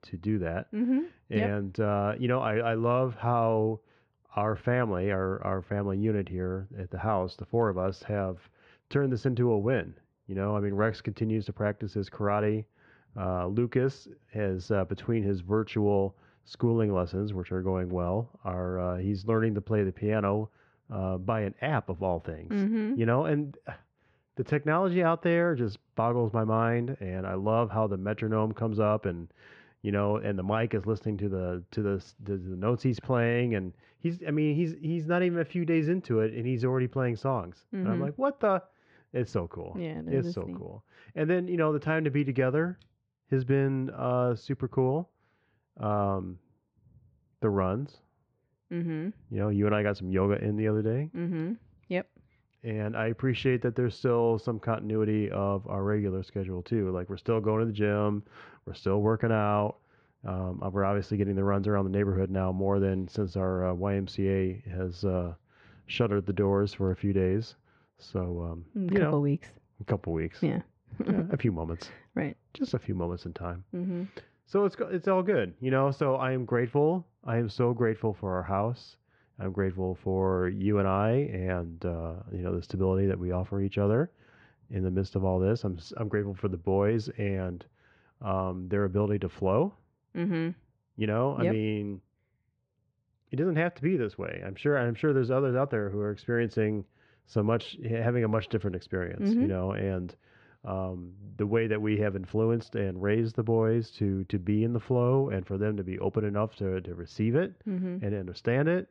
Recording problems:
muffled; slightly; fading above 2.5 kHz

